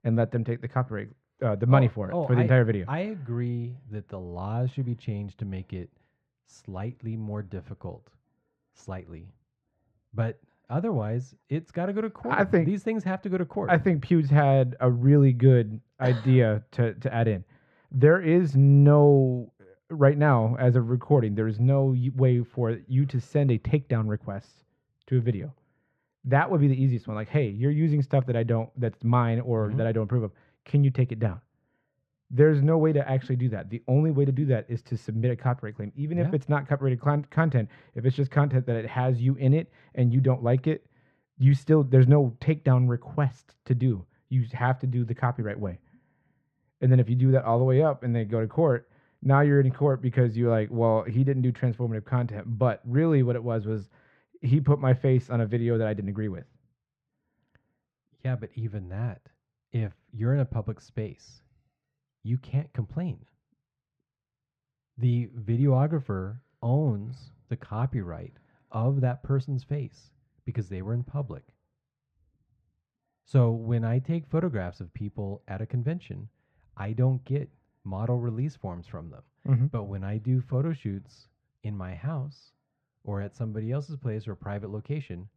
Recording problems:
muffled; very; fading above 2 kHz

